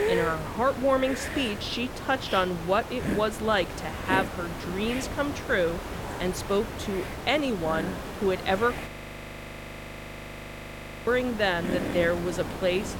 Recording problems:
hiss; loud; throughout; 7 dB below the speech
audio freezing; at 9 s for 2 s

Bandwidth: 17 kHz